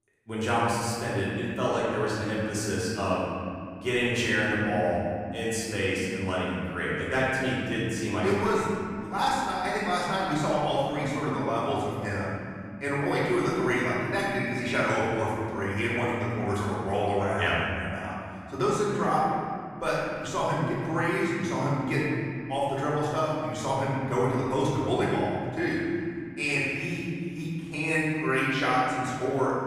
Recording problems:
room echo; strong; dies away in 2.7 s
off-mic speech; far

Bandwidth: 15 kHz